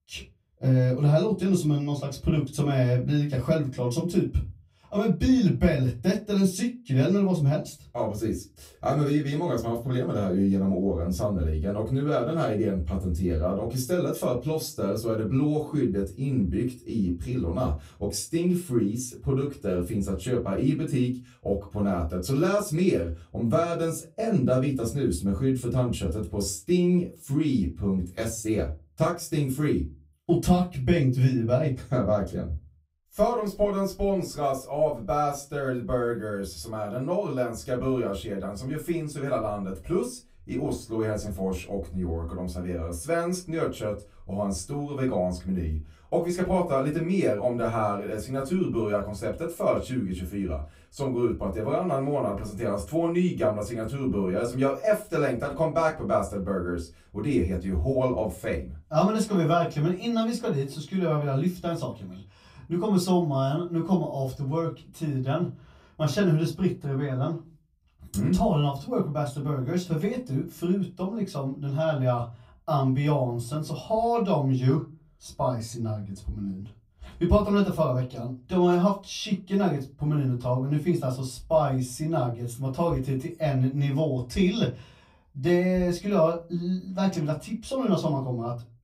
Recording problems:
off-mic speech; far
room echo; very slight; dies away in 0.2 s

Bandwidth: 15.5 kHz